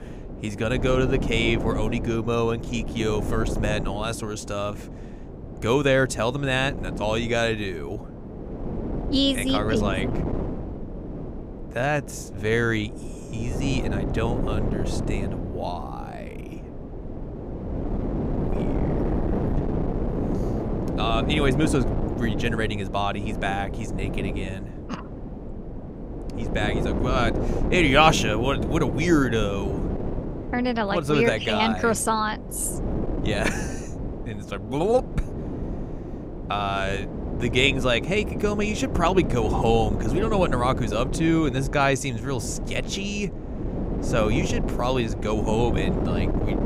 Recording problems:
wind noise on the microphone; heavy; 9 dB below the speech

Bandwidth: 15.5 kHz